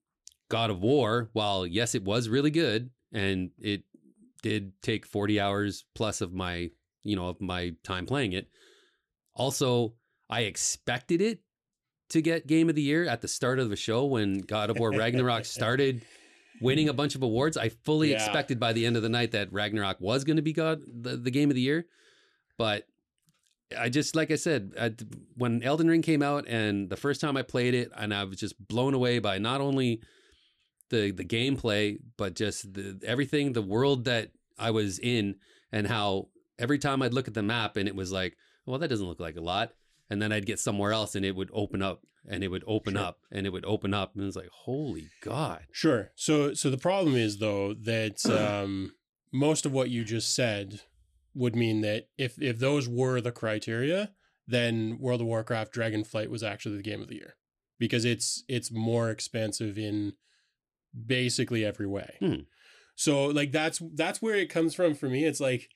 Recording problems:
none

